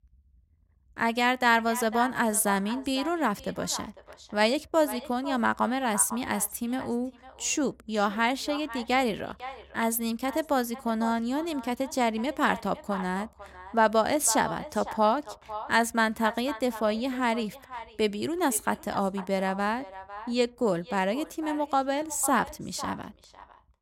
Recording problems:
echo of what is said; noticeable; throughout; 500 ms later, 15 dB below the speech

